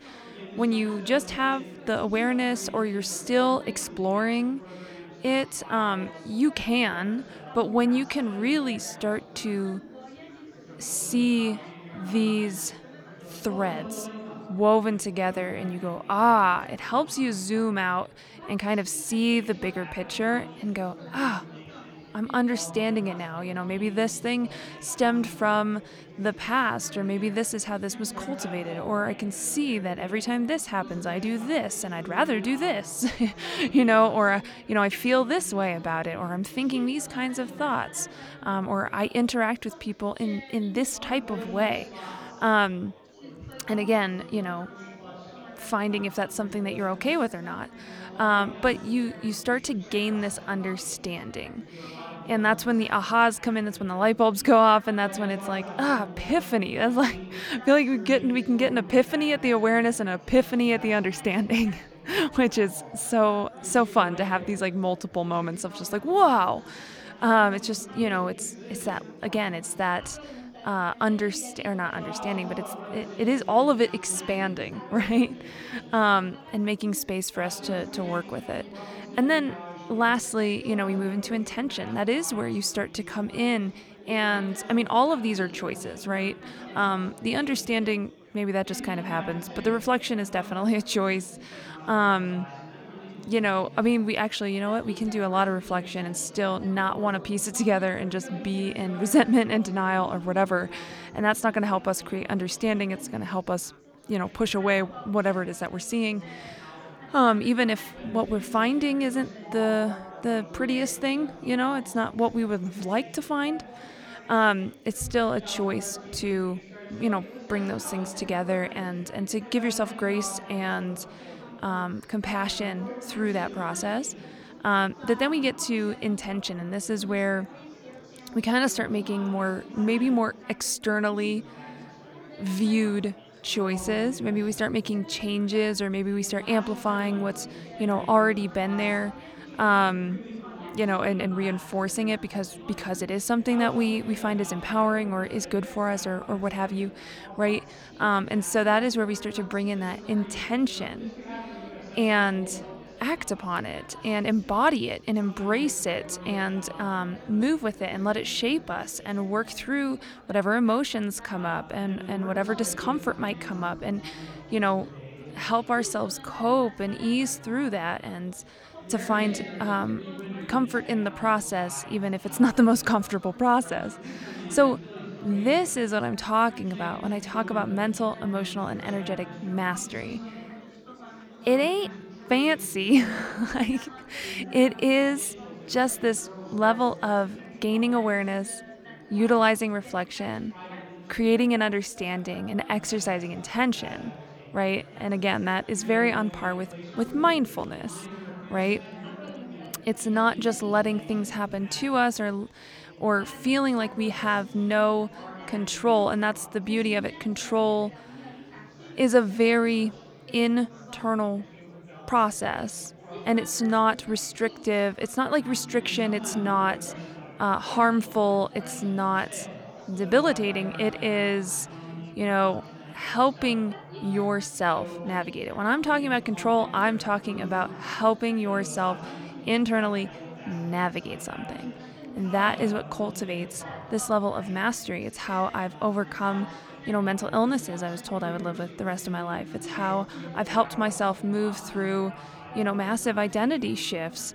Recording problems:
chatter from many people; noticeable; throughout; 15 dB below the speech

